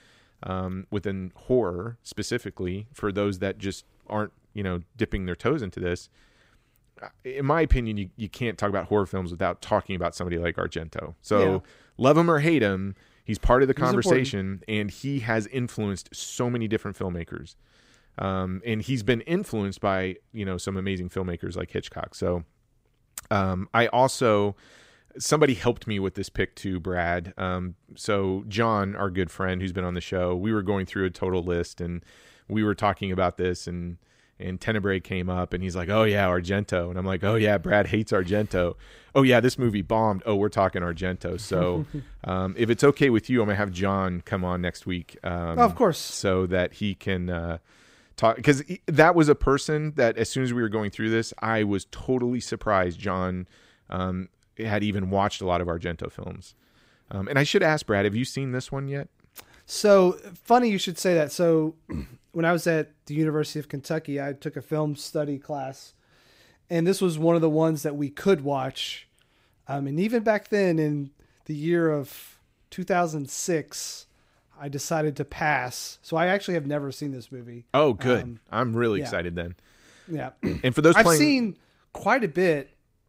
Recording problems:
none

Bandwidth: 15.5 kHz